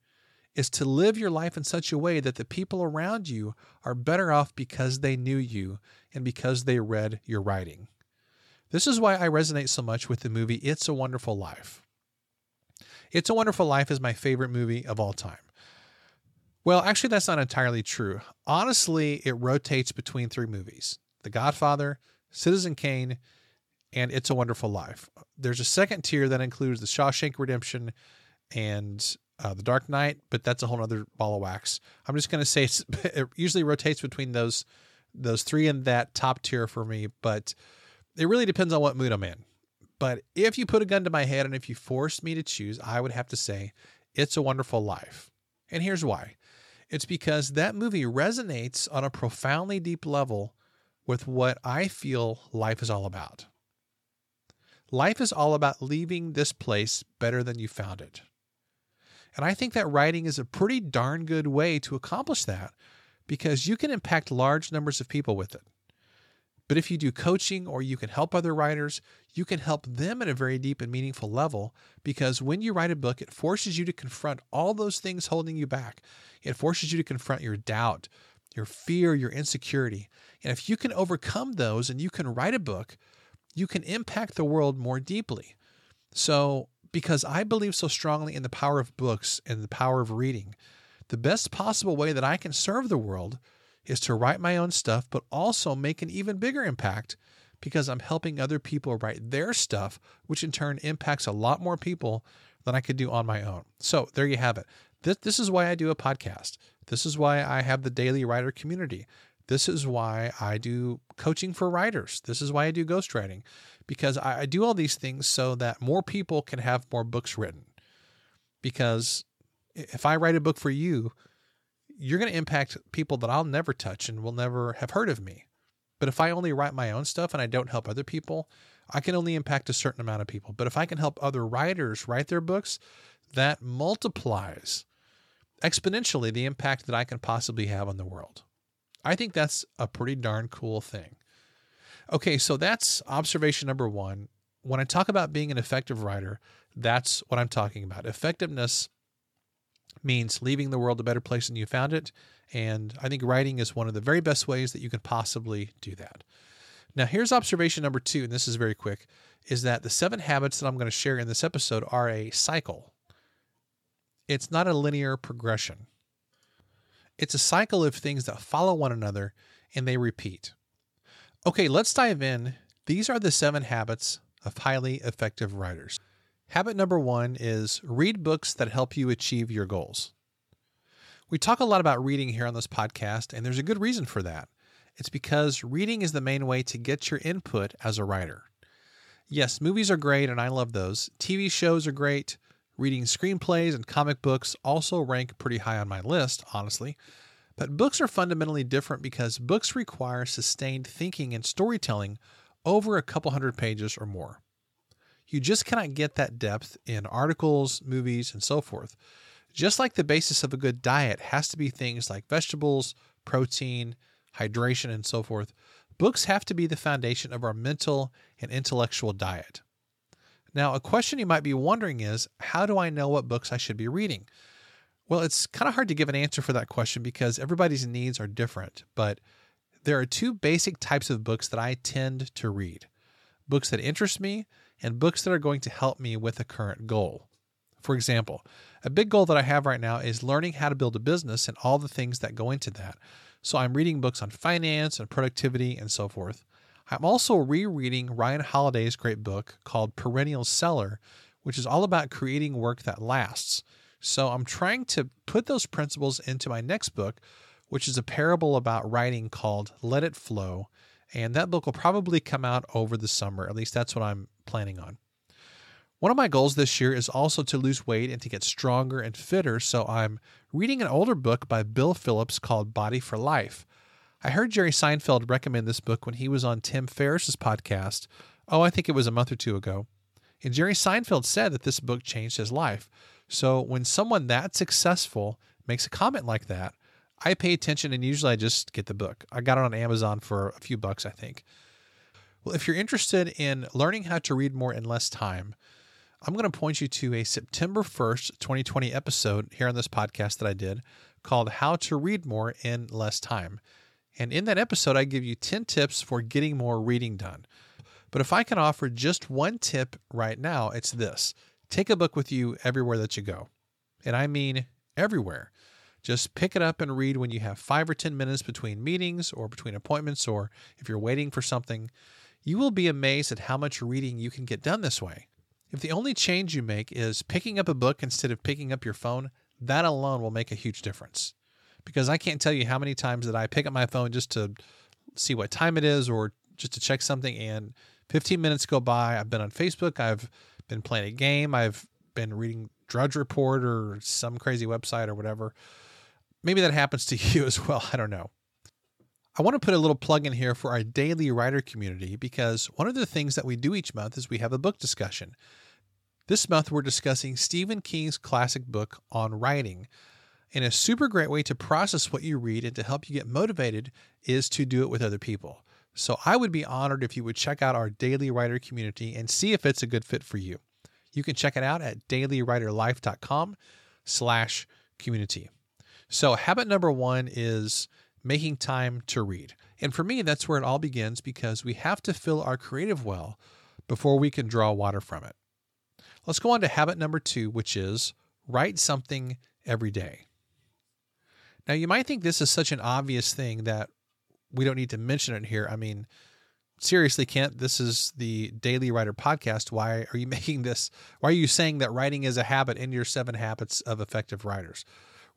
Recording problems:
none

